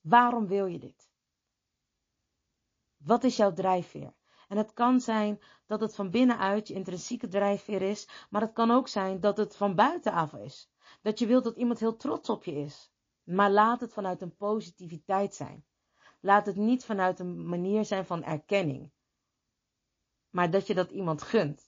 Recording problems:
garbled, watery; slightly

